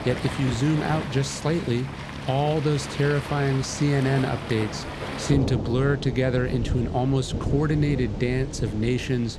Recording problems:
rain or running water; loud; throughout; 7 dB below the speech

